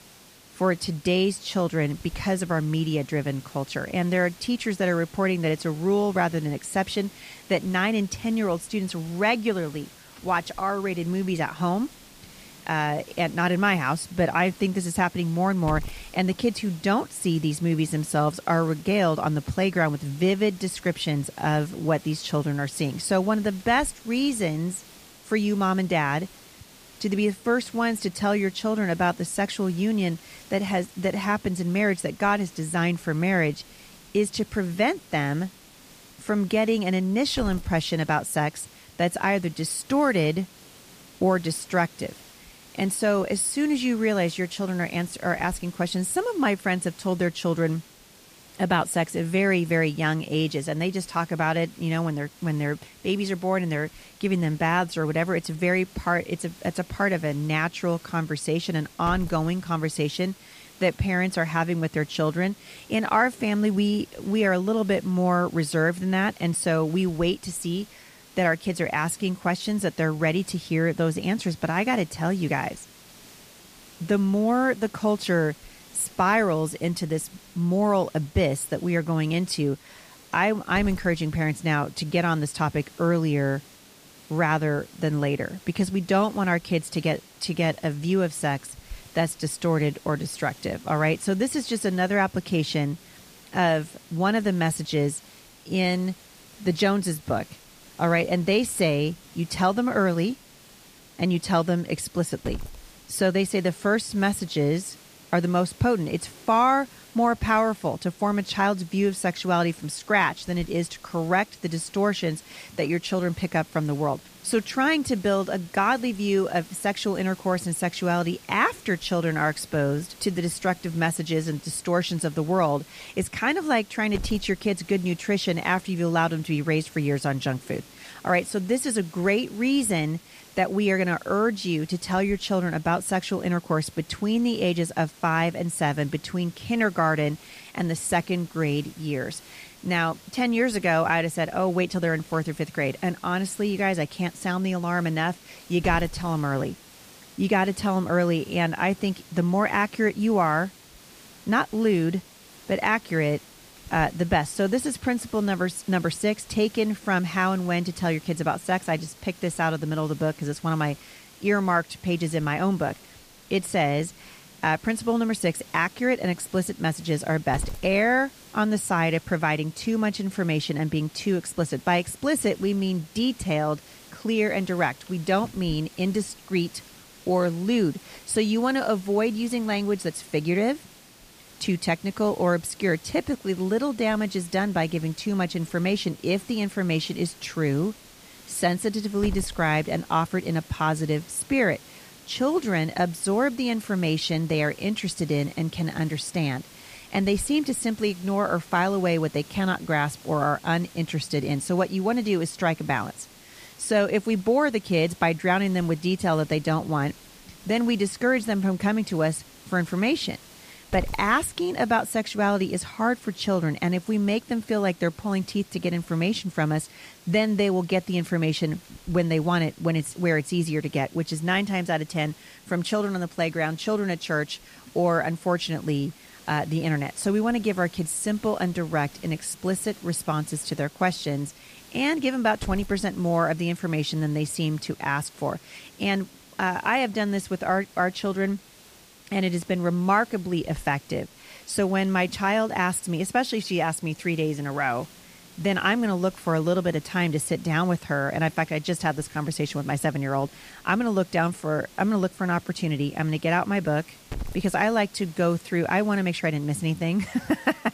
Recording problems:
hiss; faint; throughout; 20 dB below the speech

